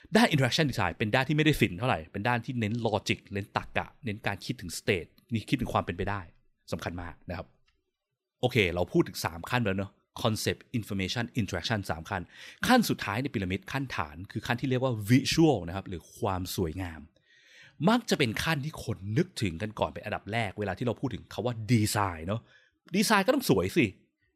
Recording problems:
none

